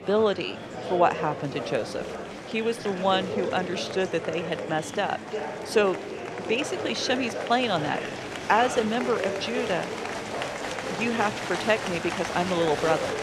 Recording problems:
murmuring crowd; loud; throughout; 5 dB below the speech

